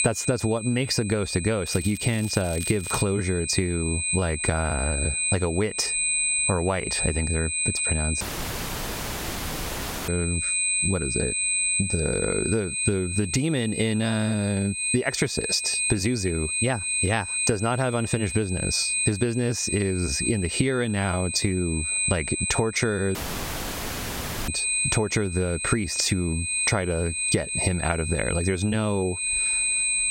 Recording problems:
squashed, flat; somewhat
high-pitched whine; loud; throughout; 8 kHz, 1 dB below the speech
crackling; noticeable; from 1.5 to 3 s; 15 dB below the speech
audio cutting out; at 8 s for 2 s and at 23 s for 1.5 s

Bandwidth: 16 kHz